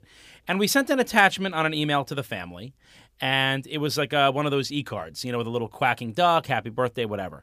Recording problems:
none

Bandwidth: 15 kHz